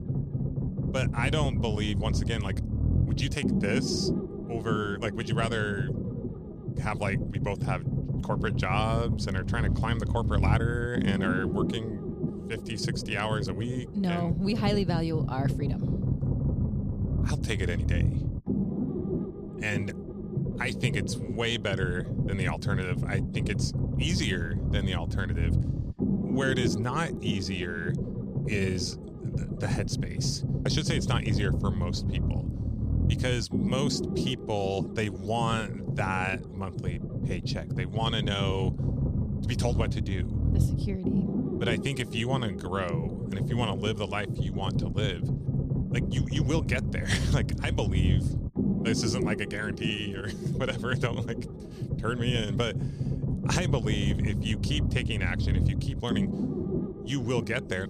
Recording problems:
low rumble; loud; throughout; 6 dB below the speech

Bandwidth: 15 kHz